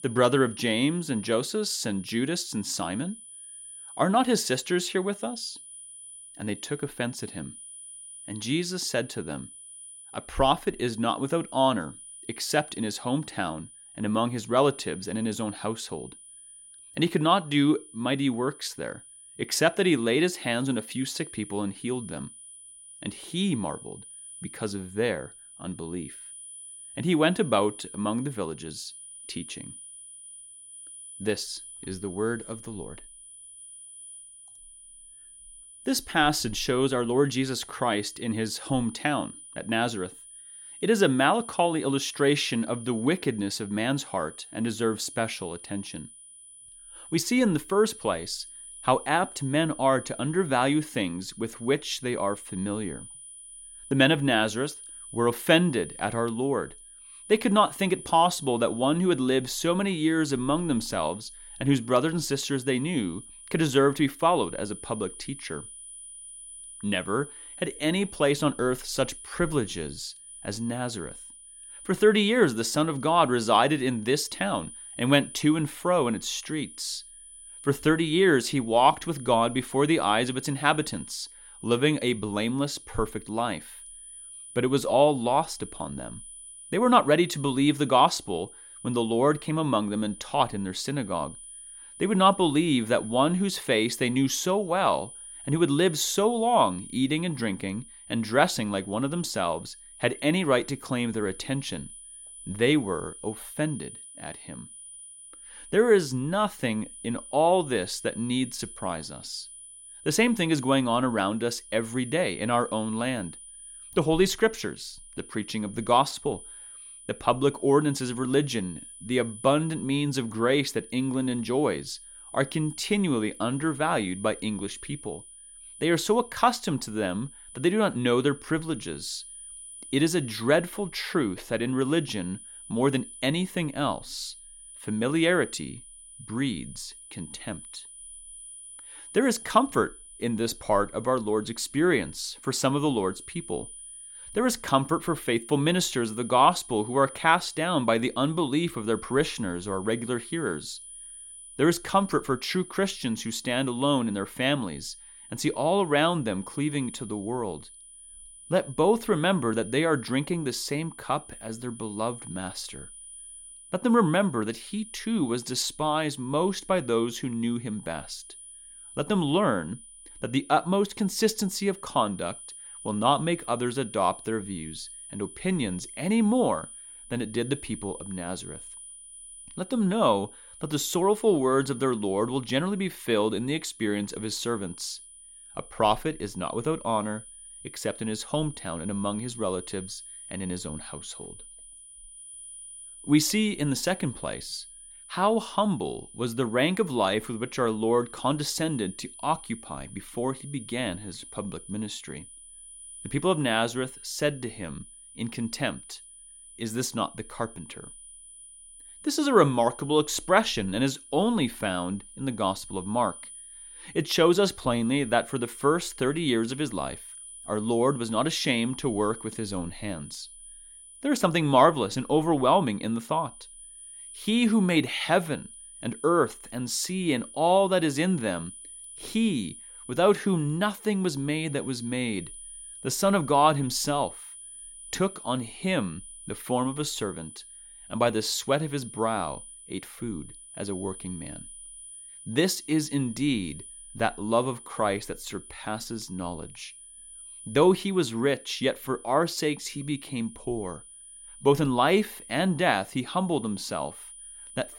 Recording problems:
high-pitched whine; noticeable; throughout; 10 kHz, 15 dB below the speech

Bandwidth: 16.5 kHz